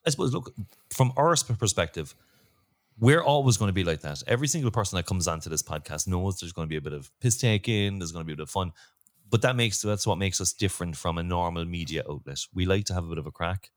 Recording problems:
none

